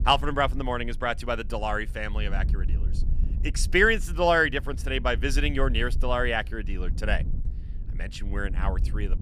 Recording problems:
wind noise on the microphone; occasional gusts; 25 dB below the speech

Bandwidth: 15 kHz